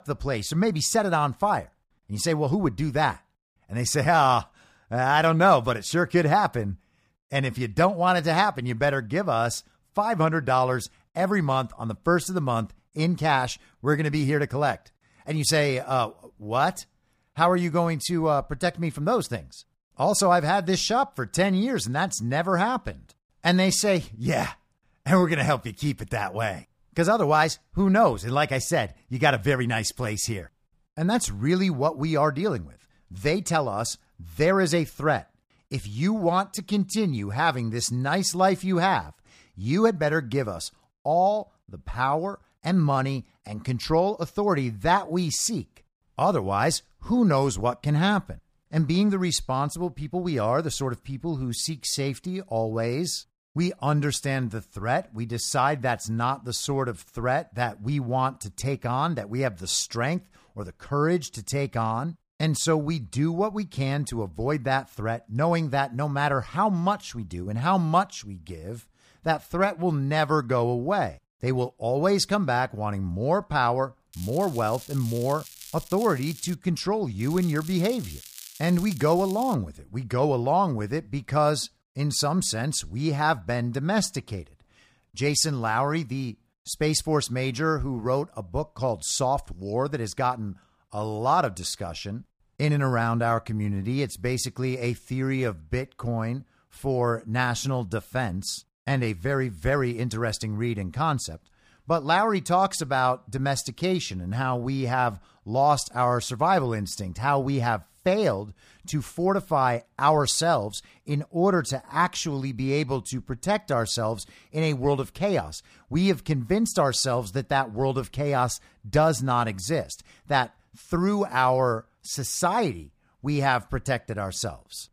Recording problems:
crackling; noticeable; from 1:14 to 1:17 and from 1:17 to 1:20; 15 dB below the speech

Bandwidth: 15 kHz